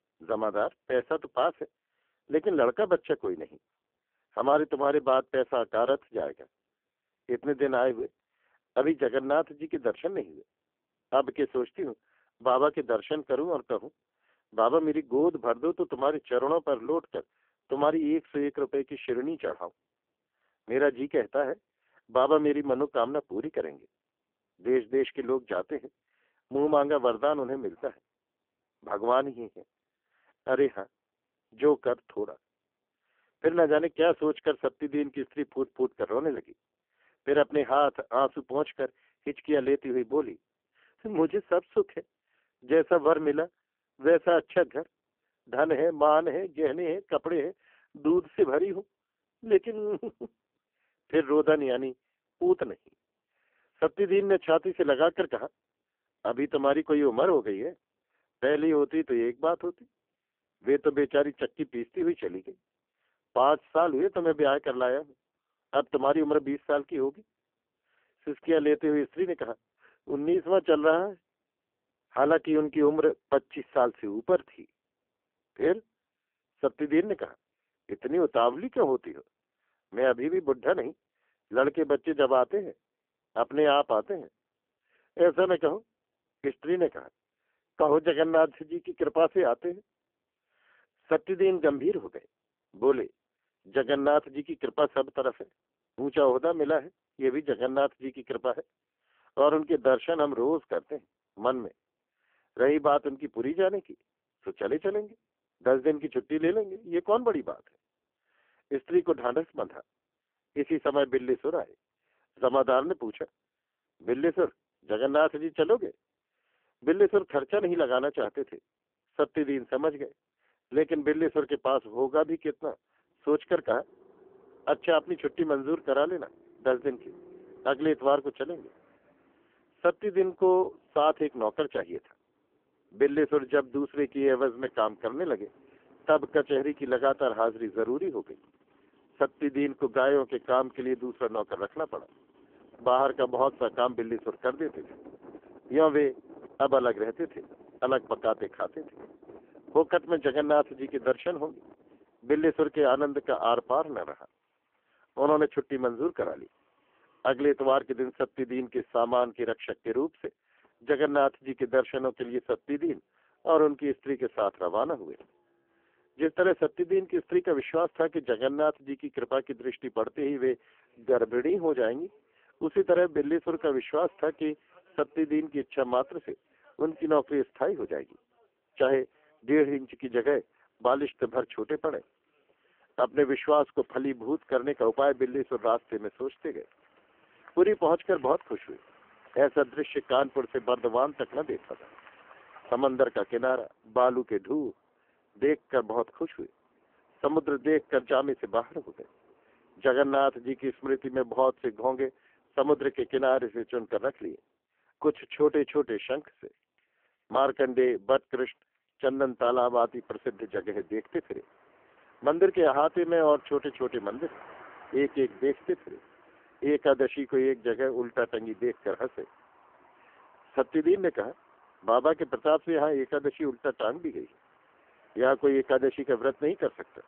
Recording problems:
phone-call audio; poor line; nothing above 3.5 kHz
traffic noise; faint; from 2:03 on; 30 dB below the speech

